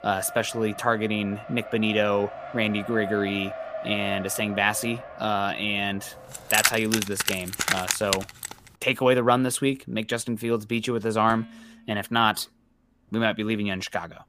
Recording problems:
traffic noise; noticeable; throughout; 10 dB below the speech
jangling keys; loud; from 6.5 to 8.5 s; peak 3 dB above the speech
clattering dishes; faint; at 11 s; peak 20 dB below the speech

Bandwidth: 15 kHz